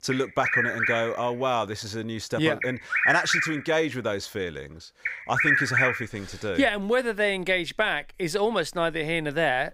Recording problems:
animal sounds; very loud; throughout; 2 dB above the speech

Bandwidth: 15.5 kHz